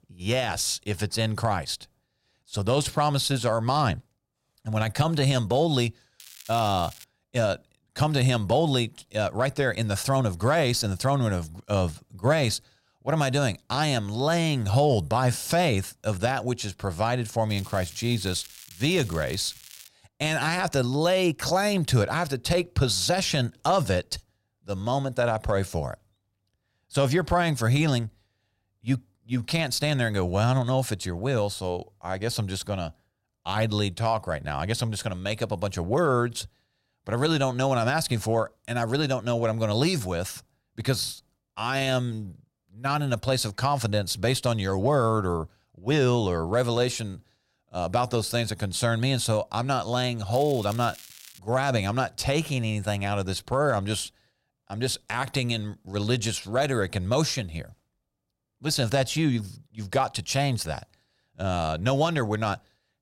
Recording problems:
crackling; noticeable; at 6 s, from 17 to 20 s and from 50 to 51 s; 20 dB below the speech

